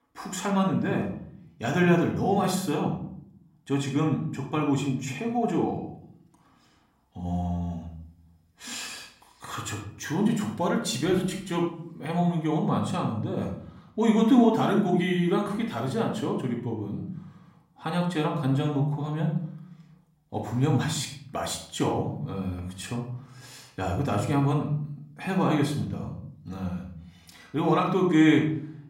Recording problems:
off-mic speech; far
room echo; slight; dies away in 0.6 s

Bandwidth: 16 kHz